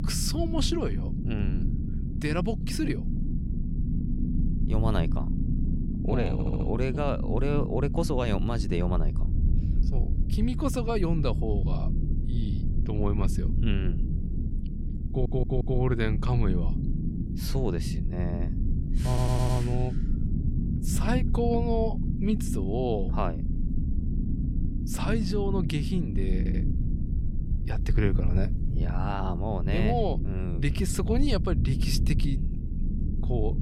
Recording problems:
low rumble; loud; throughout; 8 dB below the speech
audio stuttering; 4 times, first at 6.5 s

